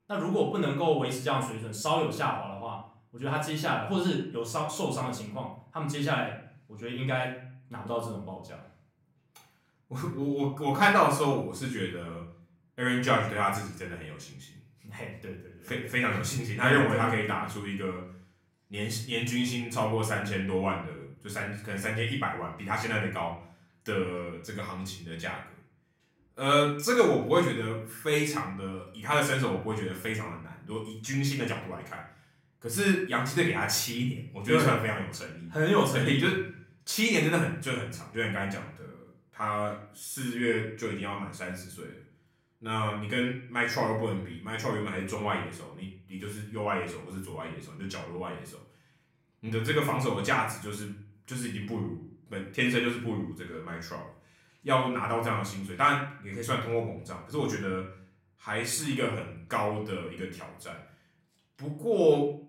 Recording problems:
off-mic speech; far
room echo; slight; dies away in 0.5 s

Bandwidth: 16 kHz